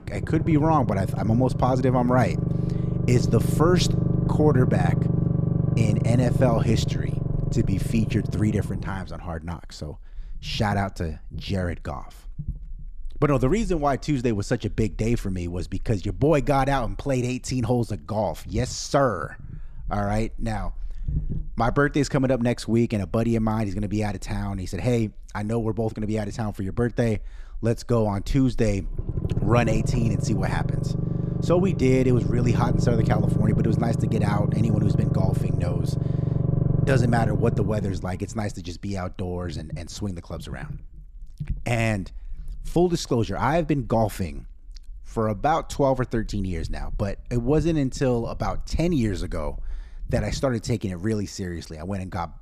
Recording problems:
low rumble; loud; throughout; 7 dB below the speech

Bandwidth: 14.5 kHz